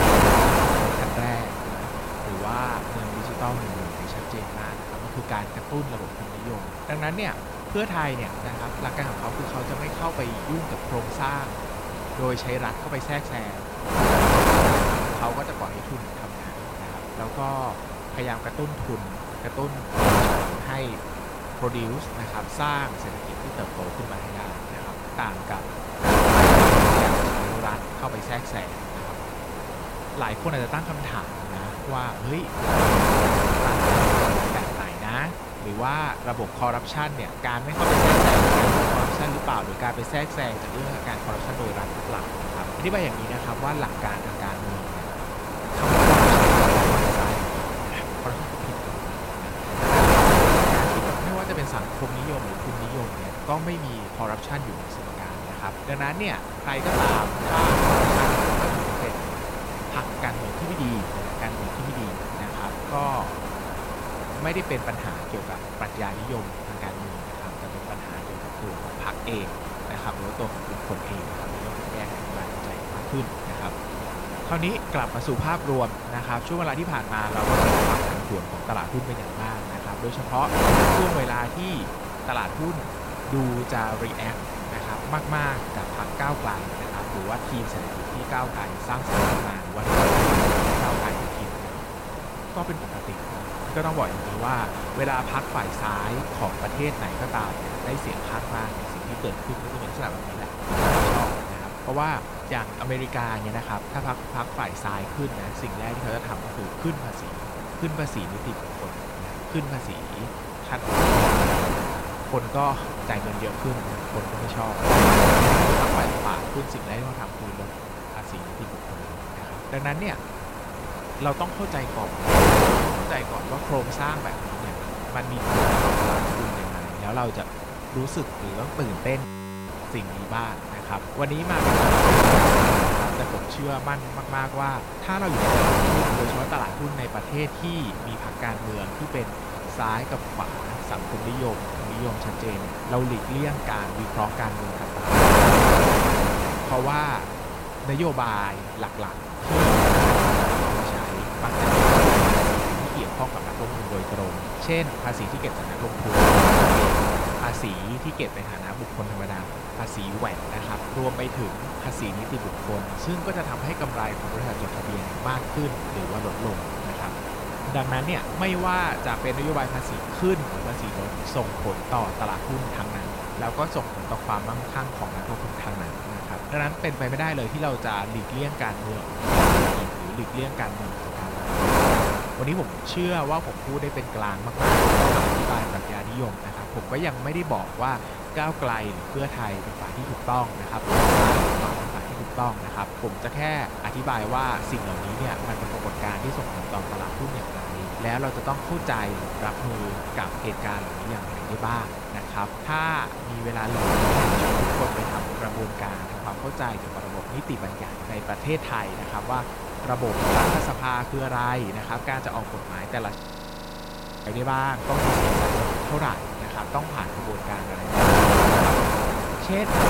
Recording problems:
wind noise on the microphone; heavy; 5 dB above the speech
audio freezing; at 2:09 and at 3:33 for 1 s

